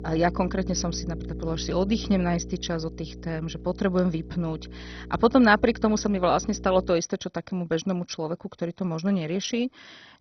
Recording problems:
garbled, watery; badly; nothing above 6 kHz
electrical hum; noticeable; until 7 s; 60 Hz, 20 dB below the speech

